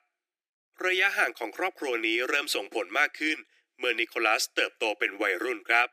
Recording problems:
thin; very; fading below 300 Hz

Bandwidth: 15 kHz